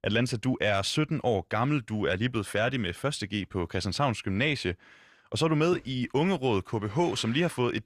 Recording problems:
none

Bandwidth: 14.5 kHz